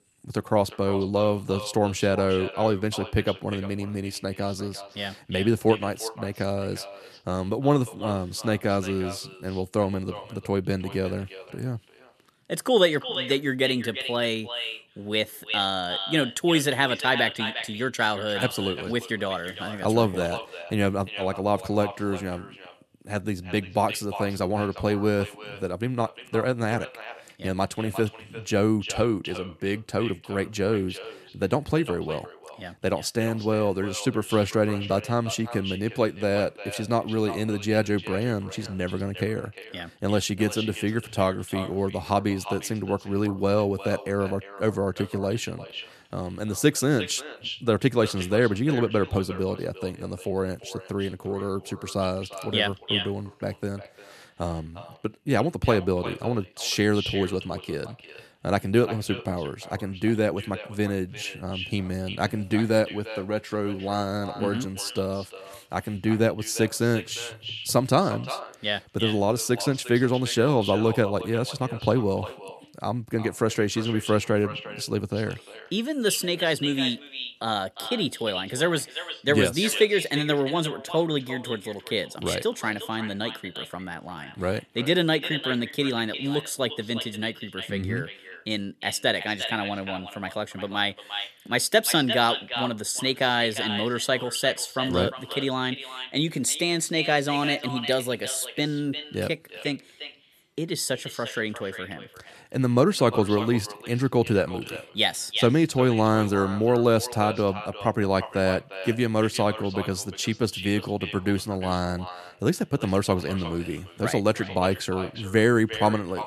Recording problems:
echo of what is said; strong; throughout; 350 ms later, 10 dB below the speech

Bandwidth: 13.5 kHz